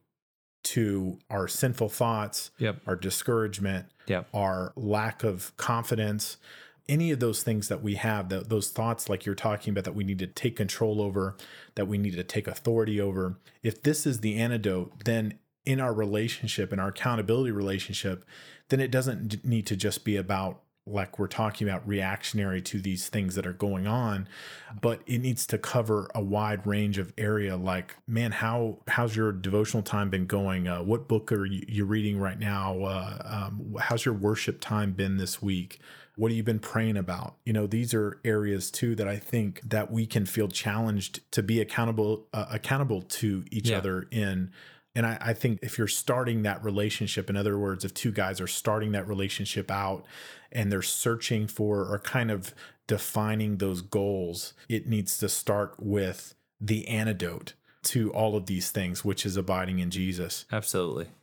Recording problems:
none

